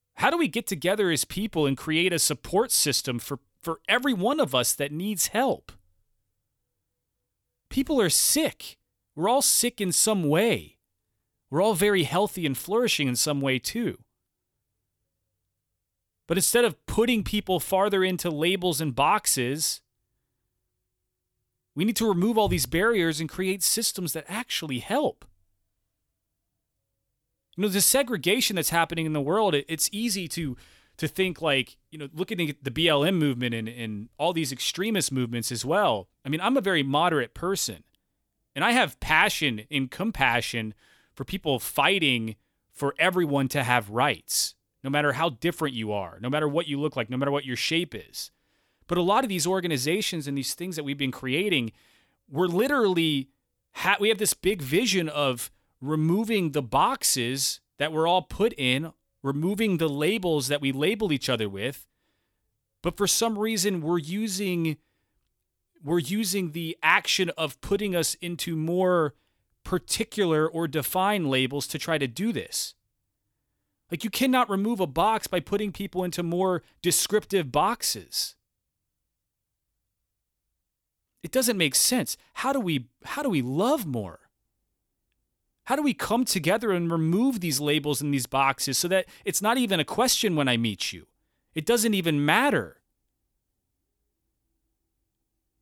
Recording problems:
none

